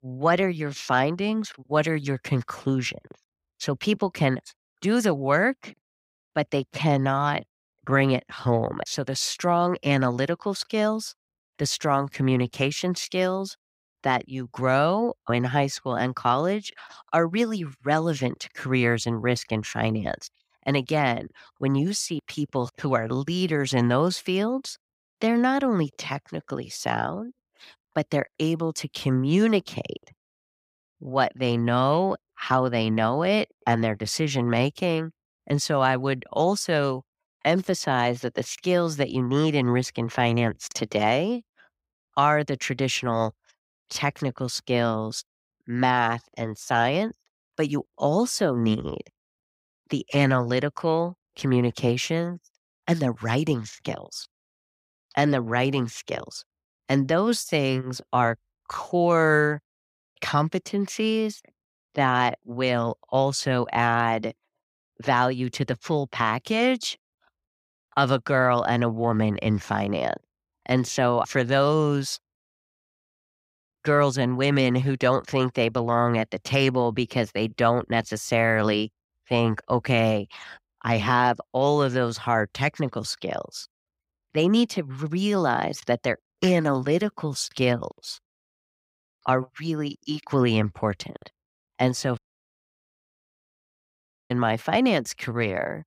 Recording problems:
audio cutting out; at 1:32 for 2 s

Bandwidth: 15.5 kHz